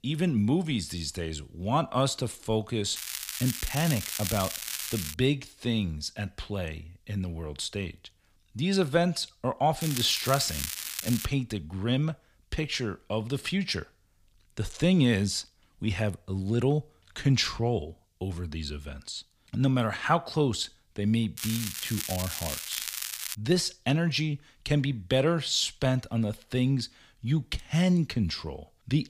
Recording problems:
crackling; loud; from 3 to 5 s, from 10 to 11 s and from 21 to 23 s; 5 dB below the speech

